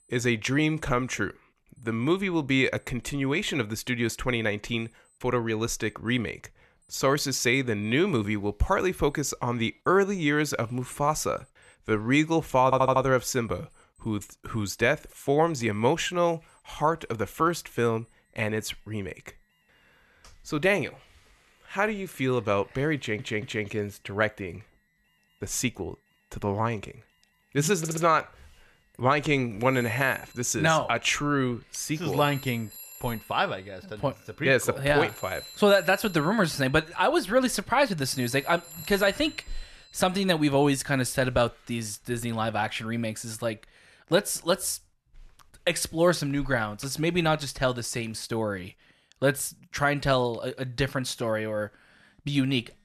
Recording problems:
alarms or sirens; noticeable; throughout; 20 dB below the speech
audio stuttering; at 13 s, at 23 s and at 28 s

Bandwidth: 13.5 kHz